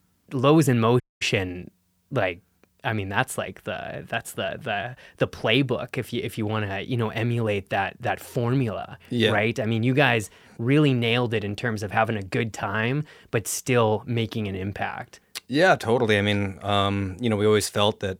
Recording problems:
audio cutting out; at 1 s

